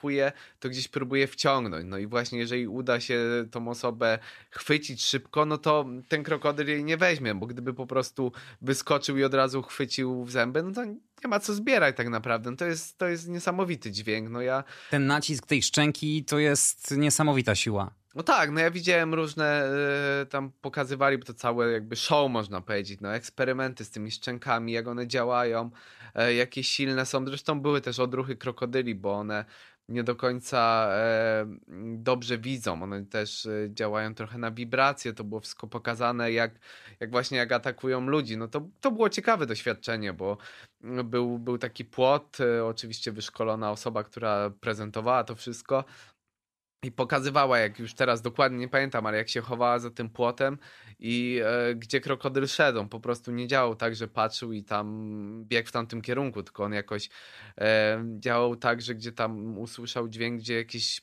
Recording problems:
none

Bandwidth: 14.5 kHz